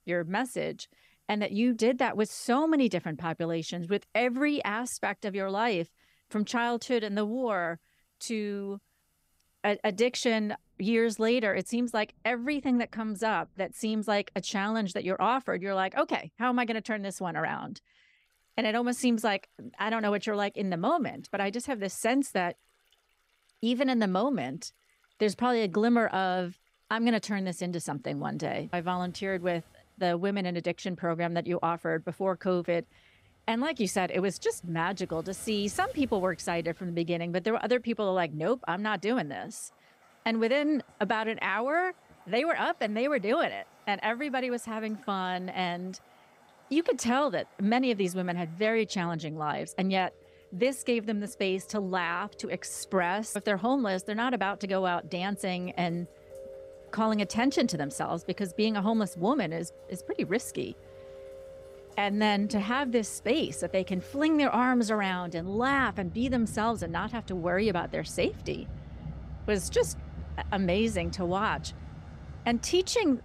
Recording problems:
rain or running water; noticeable; throughout; 20 dB below the speech

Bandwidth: 15.5 kHz